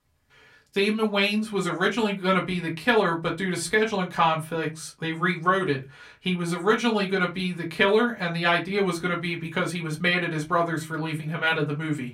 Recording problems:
off-mic speech; far
room echo; very slight; dies away in 0.2 s

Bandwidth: 16 kHz